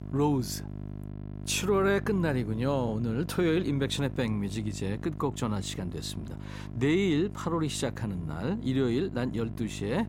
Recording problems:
electrical hum; noticeable; throughout; 50 Hz, 15 dB below the speech

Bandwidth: 16 kHz